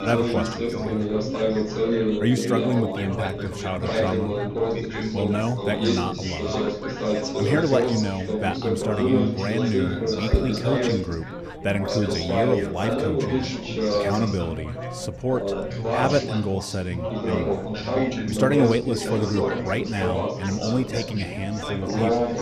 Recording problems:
chatter from many people; very loud; throughout; 1 dB above the speech

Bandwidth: 14.5 kHz